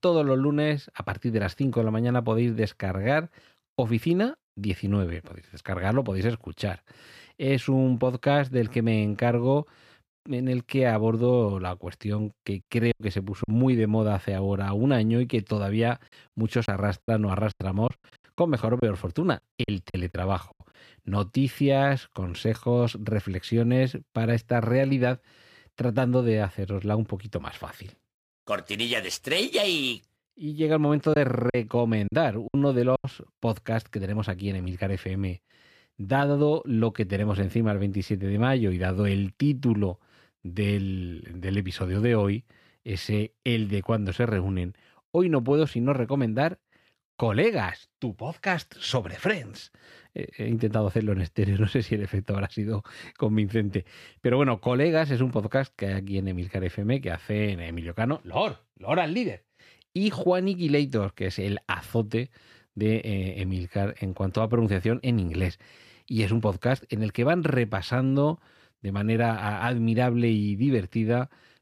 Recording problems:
choppy; very; at 13 s, from 17 to 21 s and from 31 to 33 s; 10% of the speech affected

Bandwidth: 15 kHz